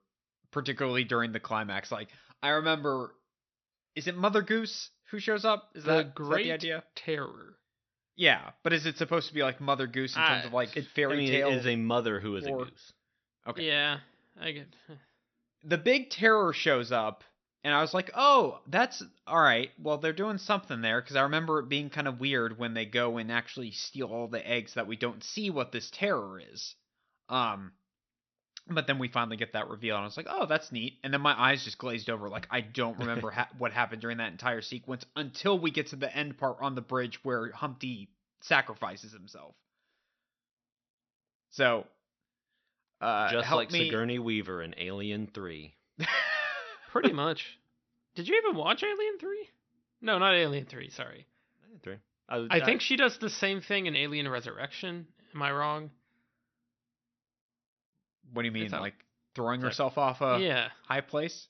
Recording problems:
high frequencies cut off; noticeable; nothing above 6 kHz

